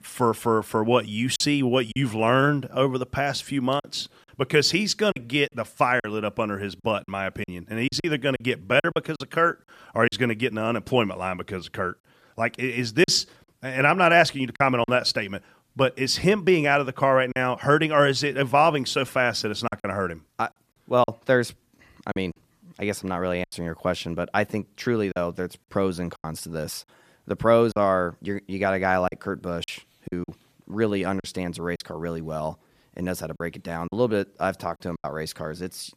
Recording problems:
choppy; very; 5% of the speech affected

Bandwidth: 14.5 kHz